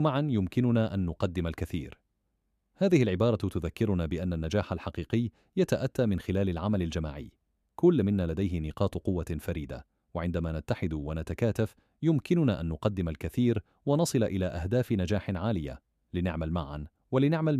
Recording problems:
abrupt cut into speech; at the start and the end

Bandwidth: 14.5 kHz